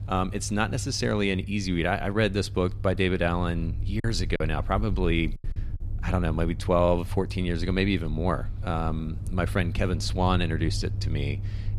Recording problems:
low rumble; faint; throughout; 20 dB below the speech
choppy; very; at 4 s; 6% of the speech affected

